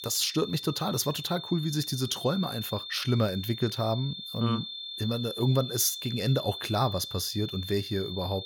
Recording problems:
high-pitched whine; loud; throughout; 3.5 kHz, 8 dB below the speech

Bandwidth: 17 kHz